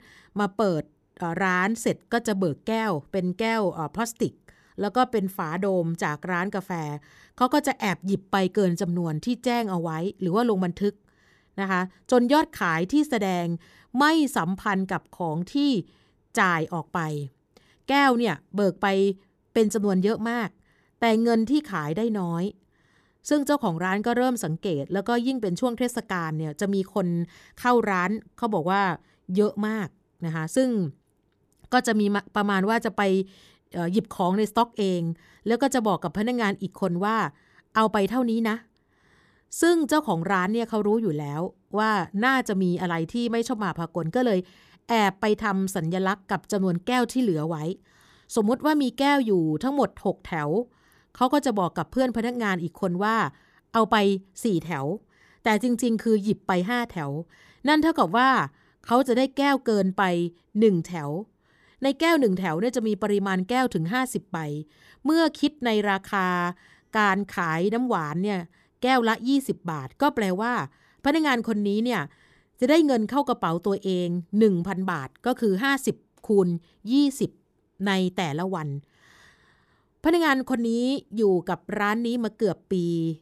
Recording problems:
none

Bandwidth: 14 kHz